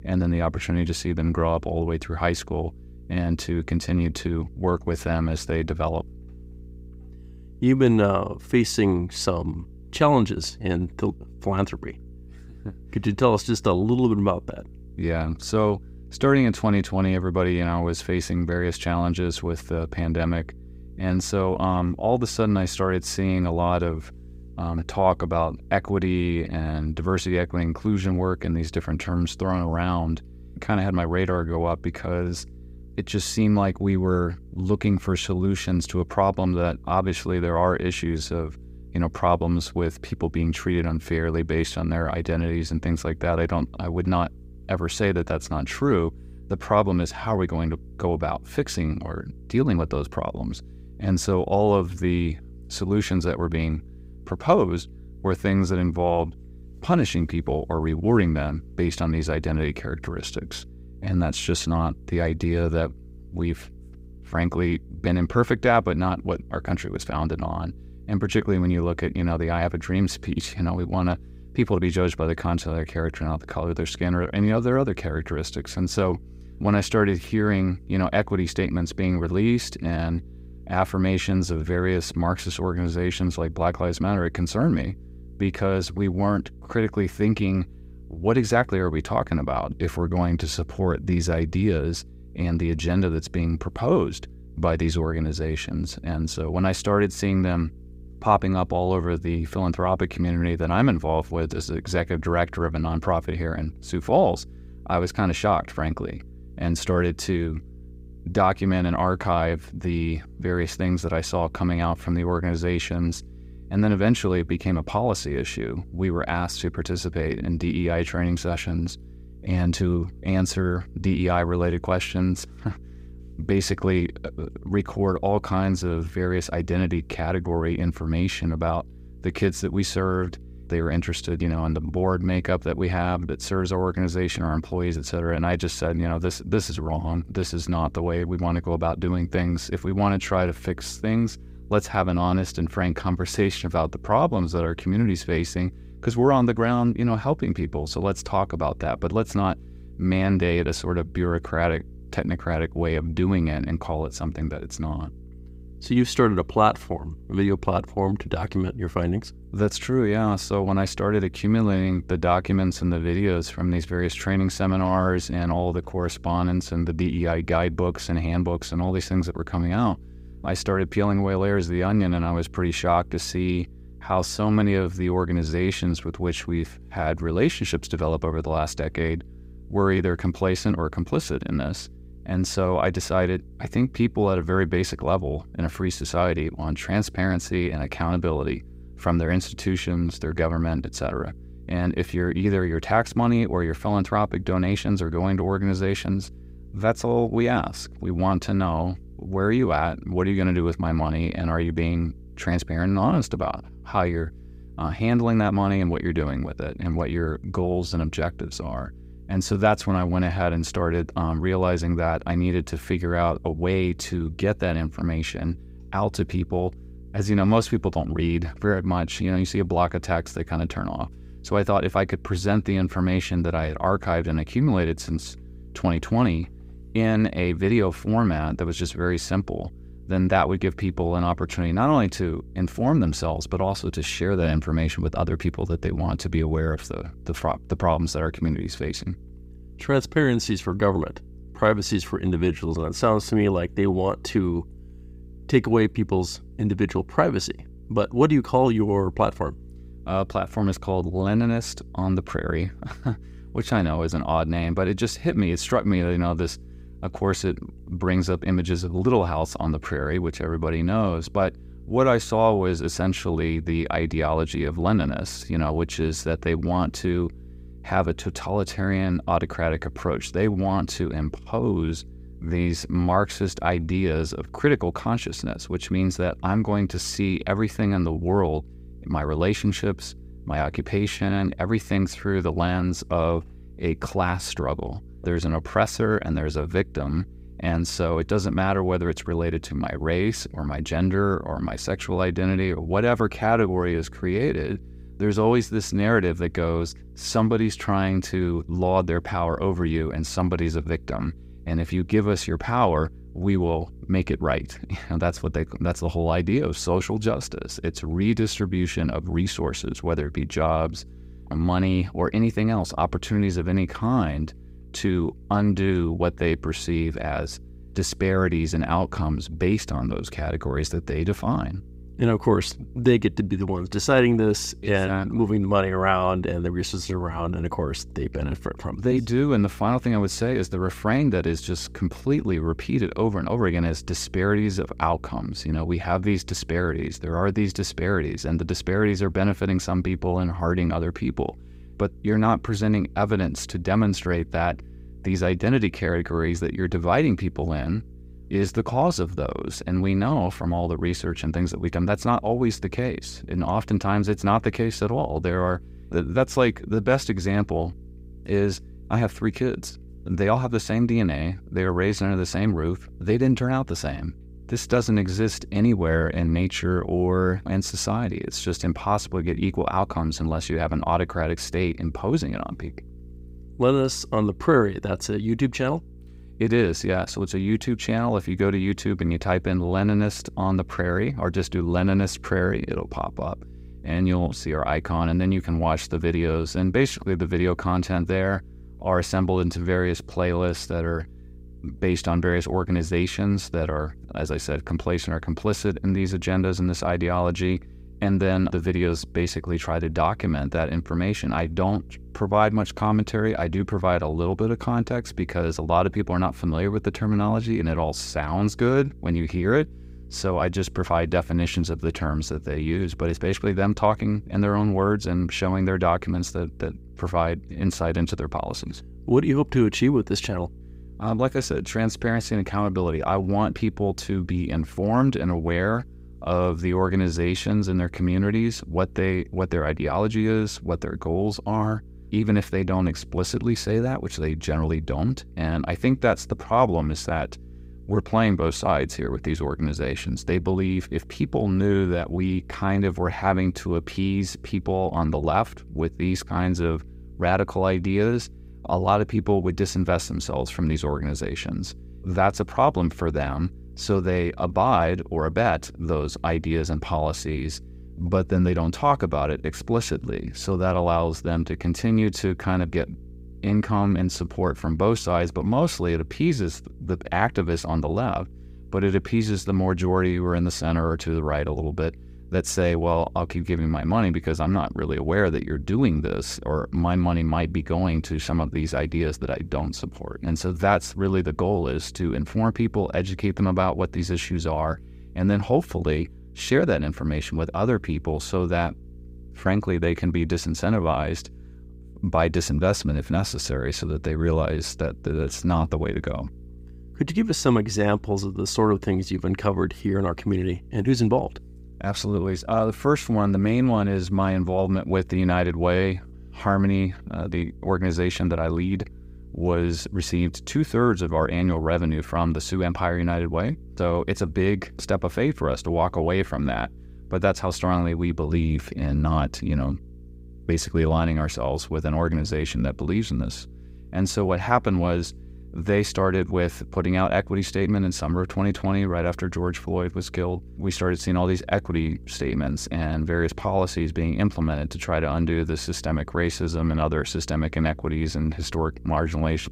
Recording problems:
electrical hum; faint; throughout; 60 Hz, 30 dB below the speech

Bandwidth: 15.5 kHz